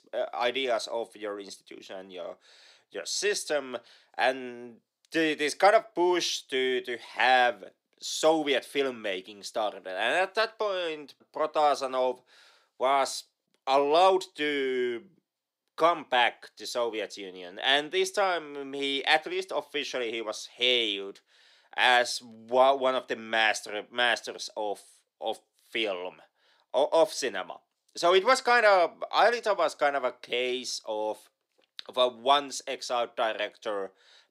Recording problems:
thin; somewhat; fading below 400 Hz

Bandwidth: 15.5 kHz